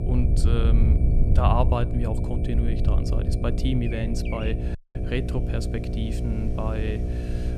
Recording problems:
electrical hum; loud; throughout; 60 Hz, 6 dB below the speech
animal sounds; noticeable; throughout; 15 dB below the speech
wind noise on the microphone; occasional gusts; 10 dB below the speech
high-pitched whine; faint; throughout; 2.5 kHz, 30 dB below the speech
audio cutting out; at 5 s

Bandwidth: 14.5 kHz